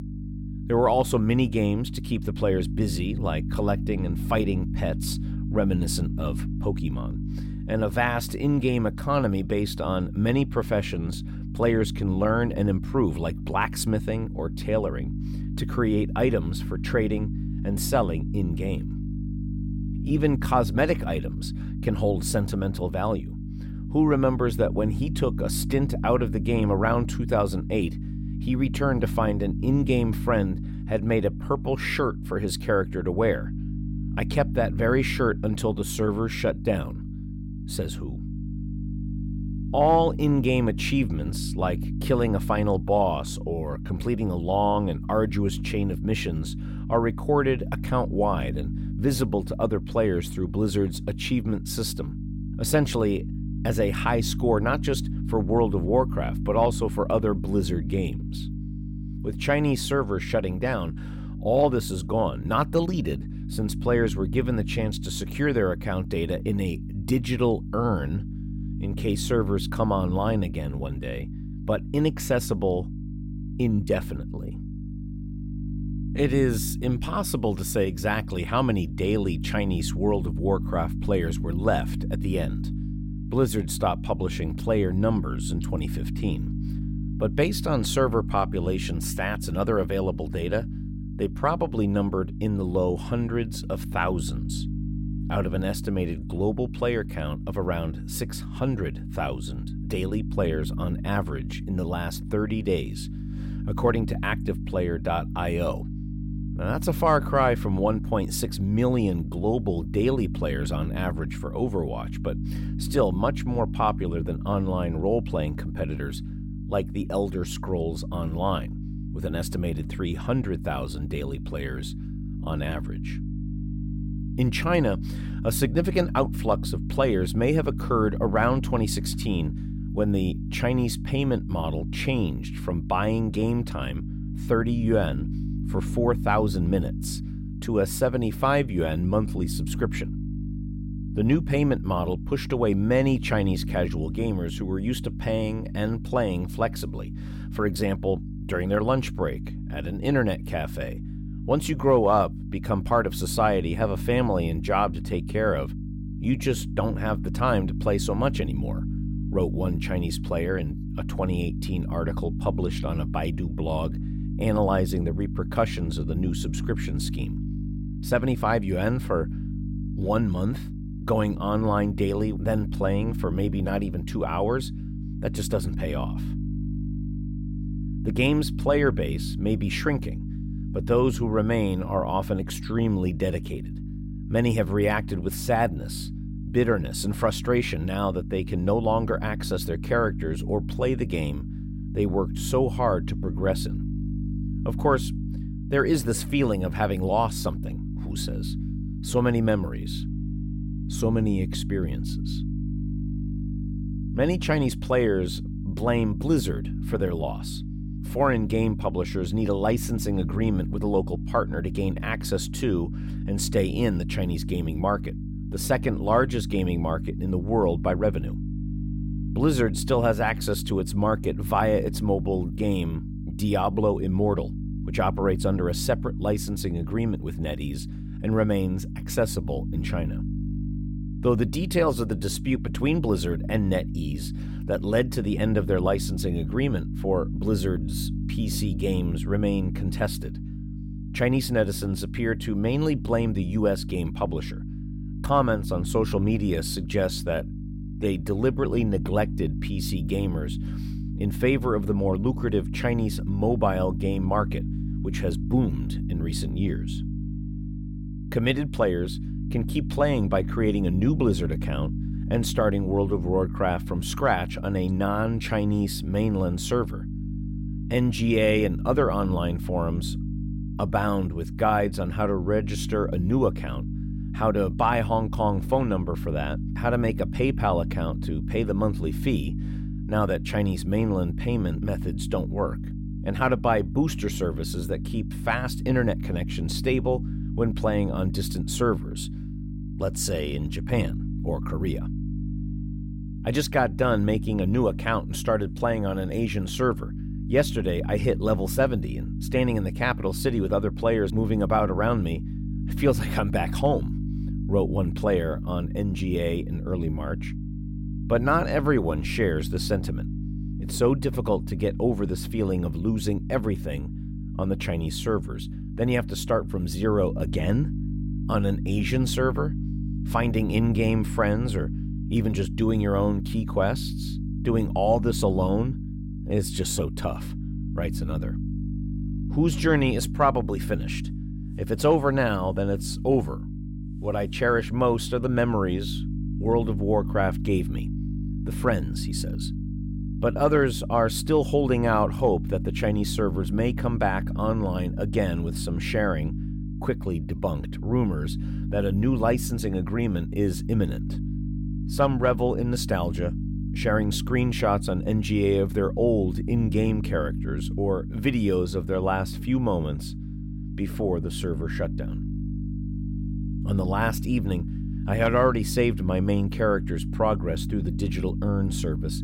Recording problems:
electrical hum; noticeable; throughout; 50 Hz, 15 dB below the speech

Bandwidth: 16 kHz